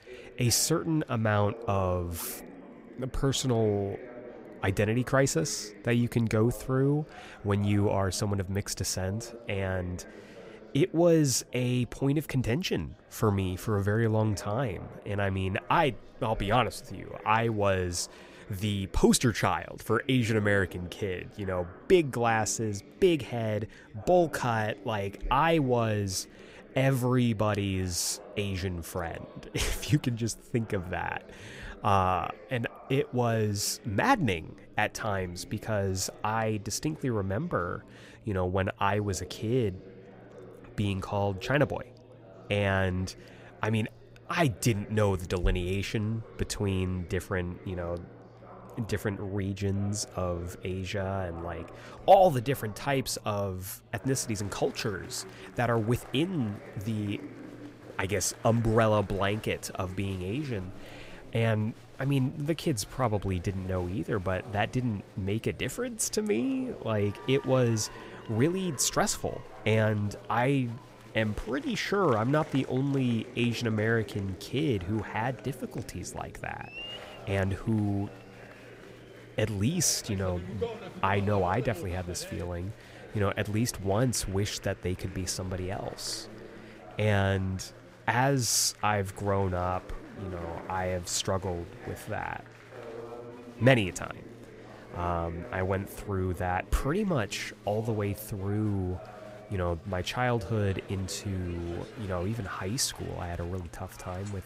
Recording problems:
chatter from many people; noticeable; throughout; 20 dB below the speech

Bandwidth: 15.5 kHz